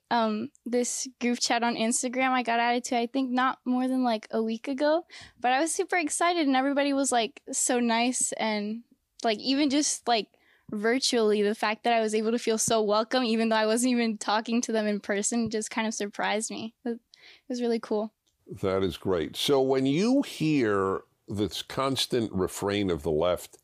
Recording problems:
none

